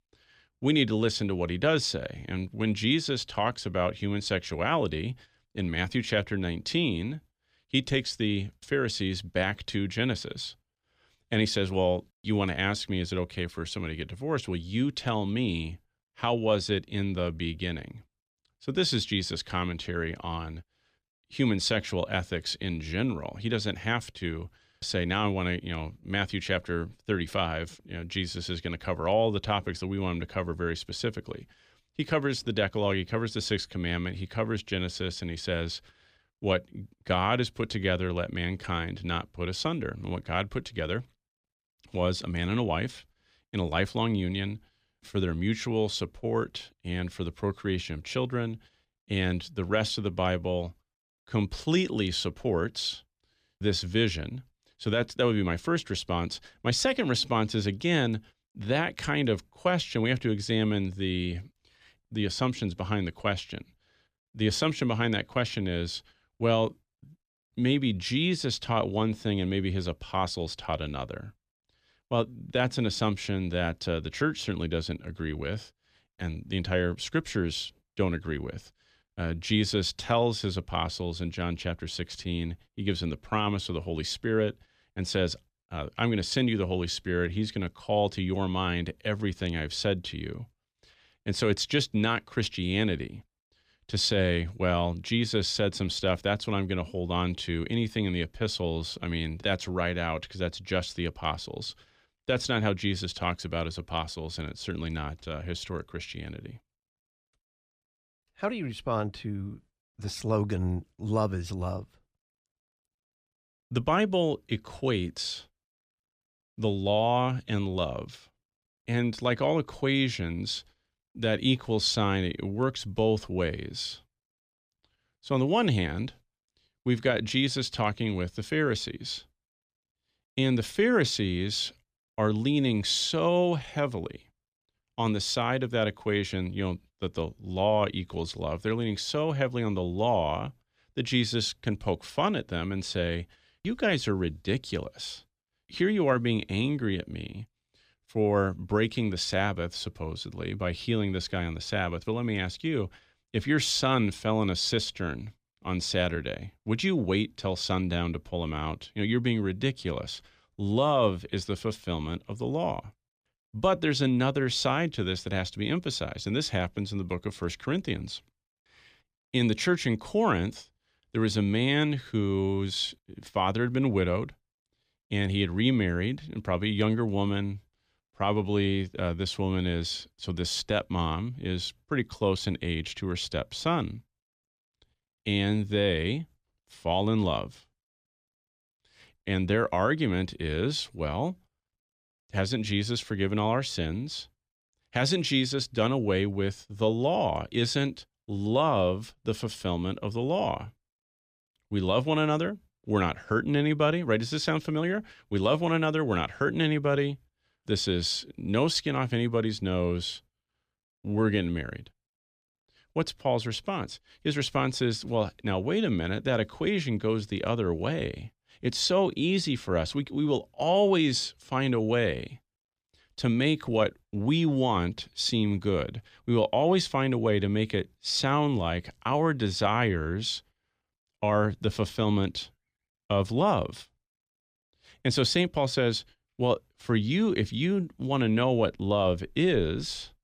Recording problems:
none

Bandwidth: 15 kHz